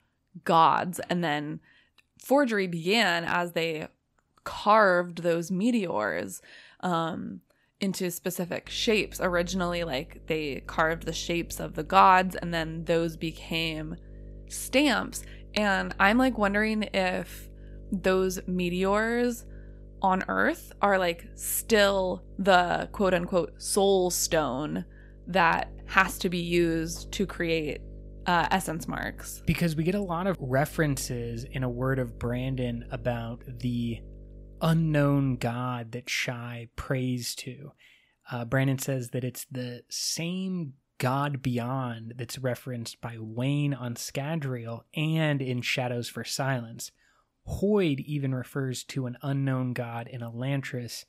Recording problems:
electrical hum; faint; from 8.5 to 35 s; 50 Hz, 30 dB below the speech

